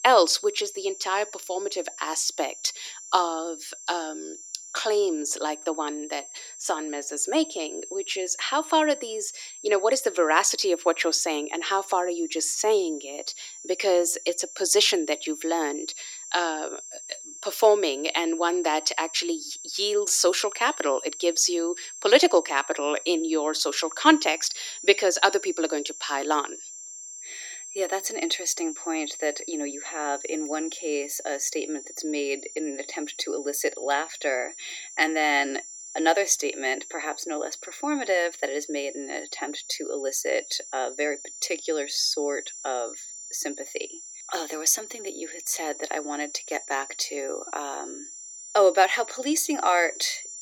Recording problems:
thin; somewhat; fading below 300 Hz
high-pitched whine; noticeable; throughout; 7.5 kHz, 10 dB below the speech

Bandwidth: 17.5 kHz